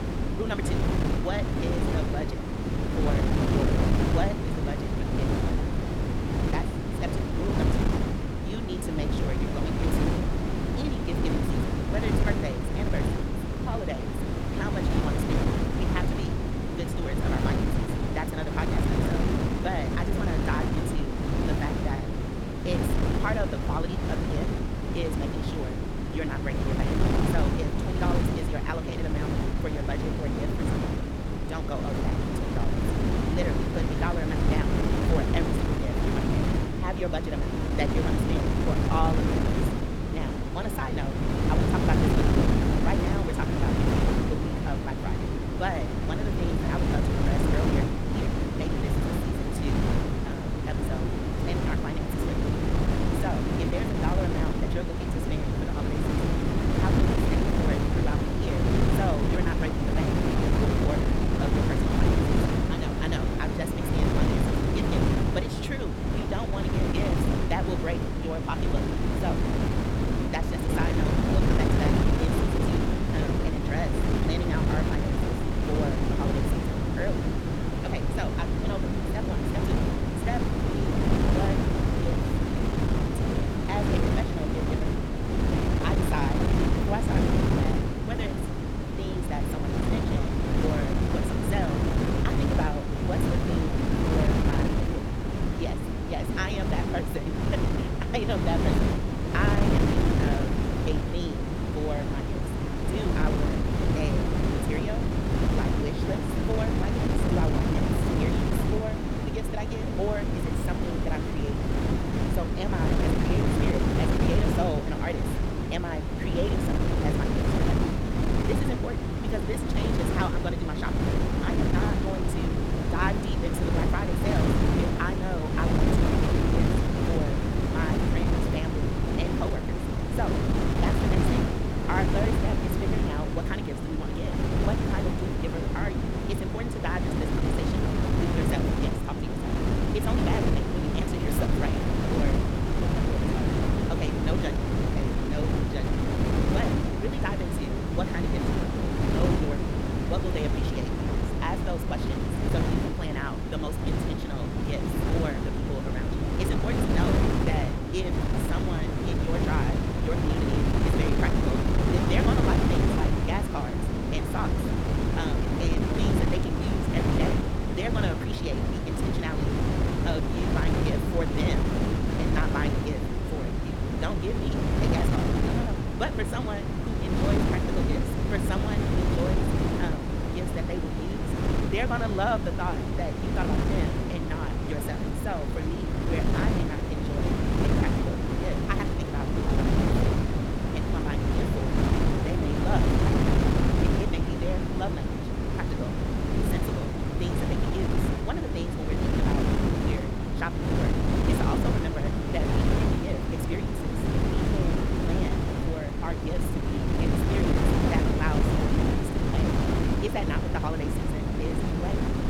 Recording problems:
wrong speed, natural pitch; too fast; 1.7 times normal speed
wind noise on the microphone; heavy; 3 dB above the speech

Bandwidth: 17.5 kHz